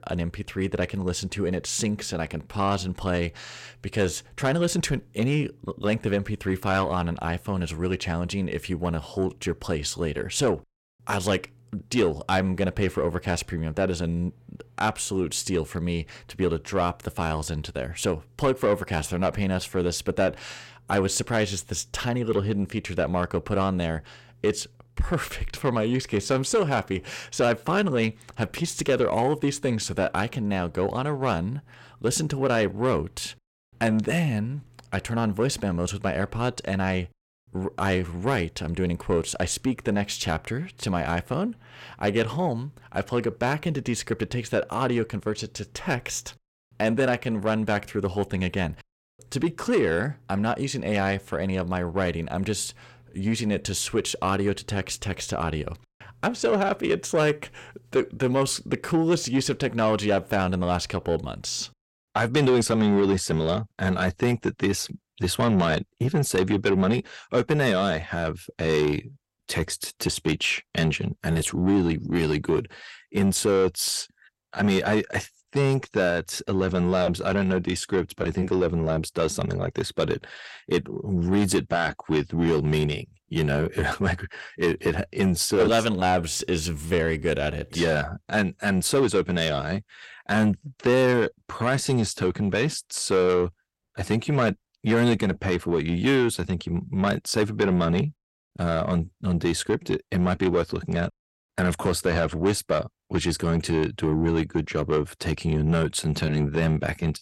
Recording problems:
distortion; slight; 10 dB below the speech

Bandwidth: 16.5 kHz